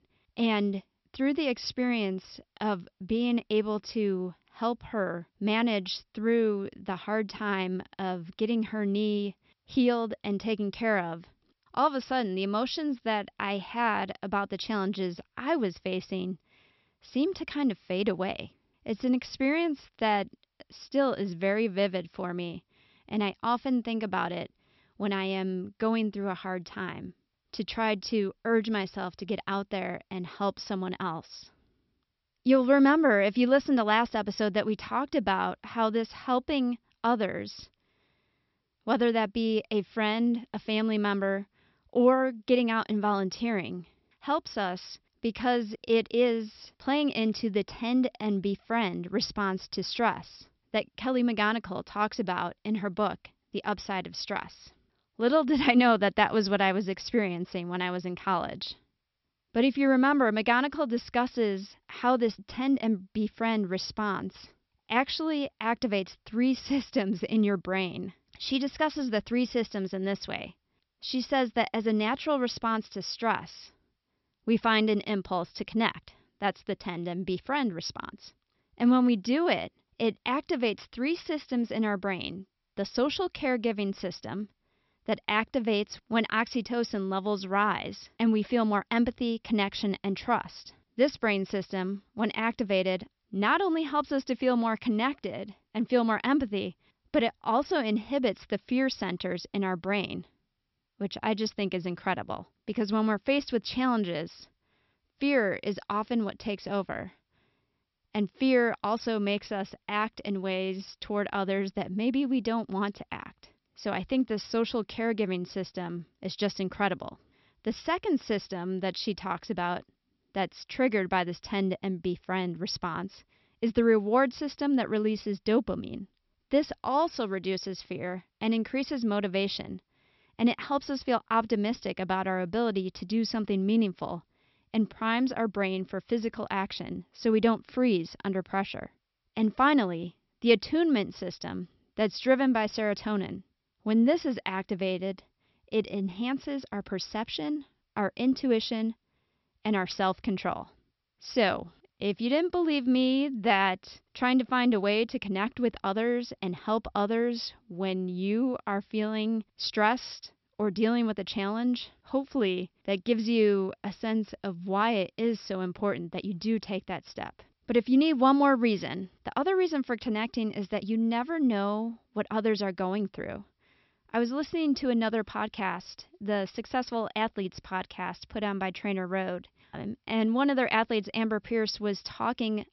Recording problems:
high frequencies cut off; noticeable; nothing above 5.5 kHz

